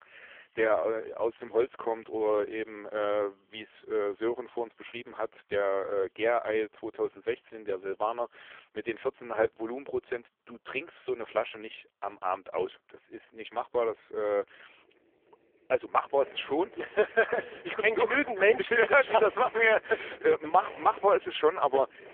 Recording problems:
phone-call audio; poor line; nothing above 3.5 kHz
traffic noise; faint; throughout; 20 dB below the speech

